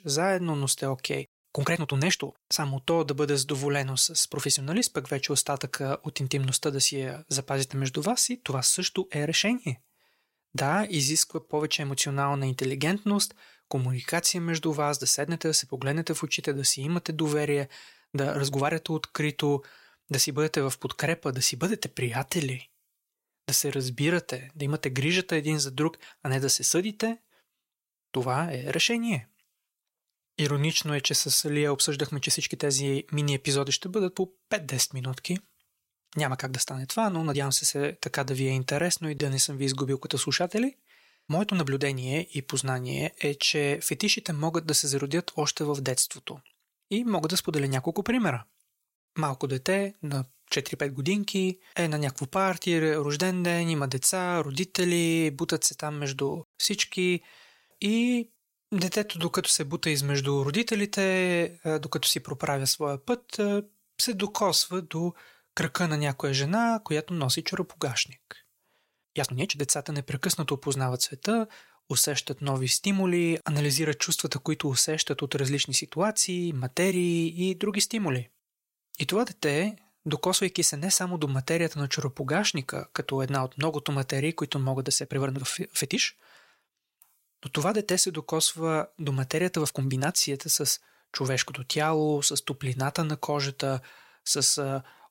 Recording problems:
uneven, jittery; strongly; from 1.5 s to 1:30

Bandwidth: 16 kHz